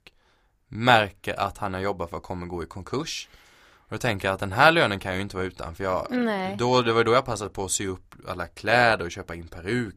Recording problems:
none

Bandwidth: 15 kHz